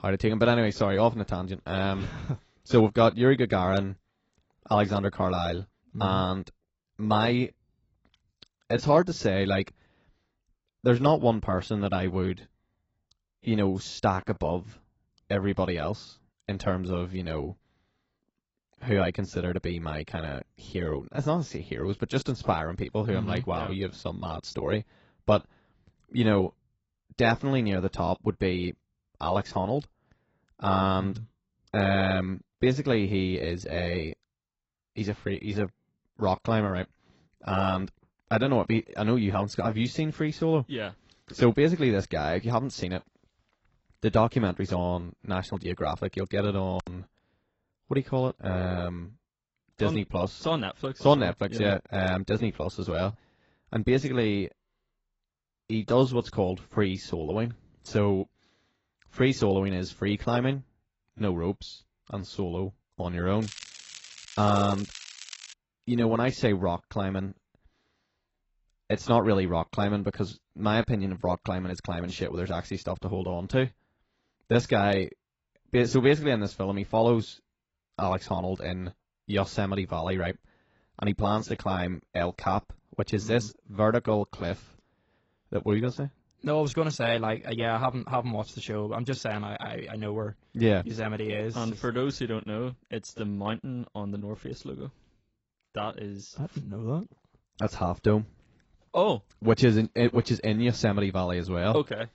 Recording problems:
garbled, watery; badly; nothing above 7.5 kHz
crackling; noticeable; from 1:03 to 1:06; 15 dB below the speech

